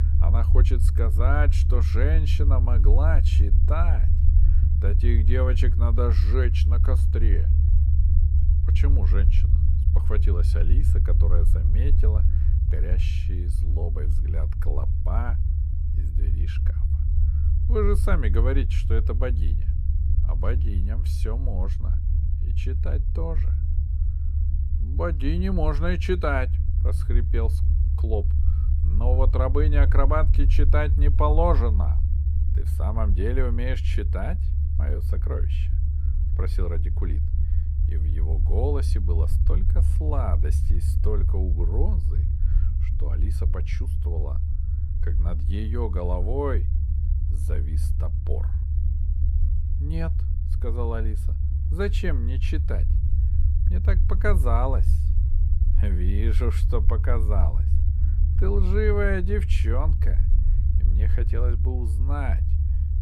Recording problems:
low rumble; loud; throughout; 9 dB below the speech

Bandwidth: 14.5 kHz